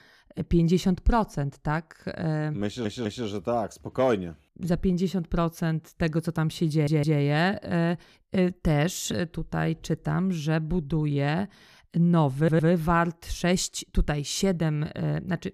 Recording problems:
audio stuttering; at 2.5 s, at 6.5 s and at 12 s

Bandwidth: 14.5 kHz